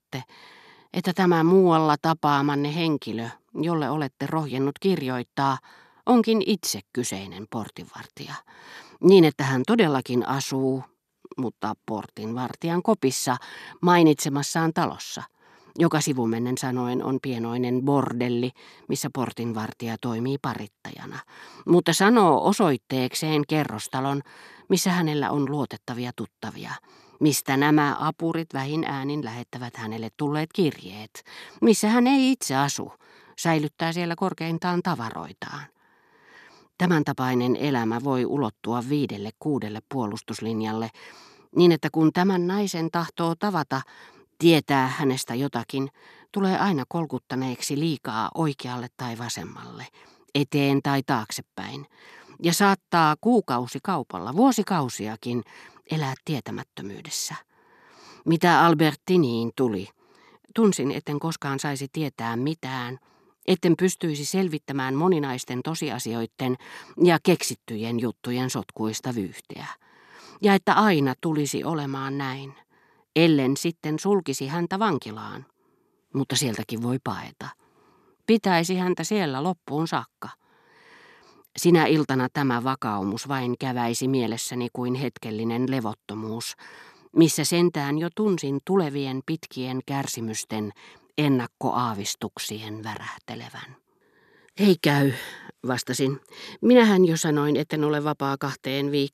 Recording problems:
none

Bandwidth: 14 kHz